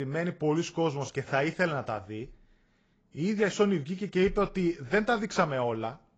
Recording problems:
garbled, watery; badly; nothing above 7.5 kHz
abrupt cut into speech; at the start

